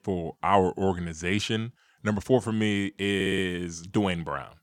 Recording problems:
audio stuttering; at 3 s

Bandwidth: 18.5 kHz